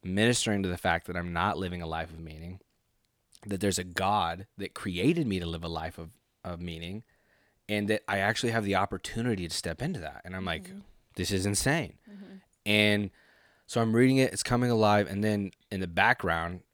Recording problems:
none

